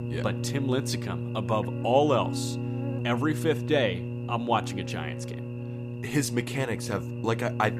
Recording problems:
electrical hum; noticeable; throughout; 60 Hz, 10 dB below the speech

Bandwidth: 14.5 kHz